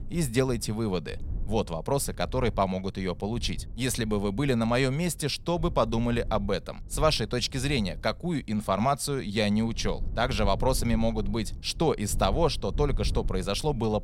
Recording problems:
low rumble; faint; throughout; 25 dB below the speech

